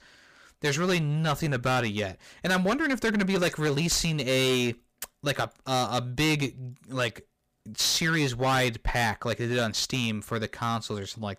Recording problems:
distortion; heavy; 12% of the sound clipped

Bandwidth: 15 kHz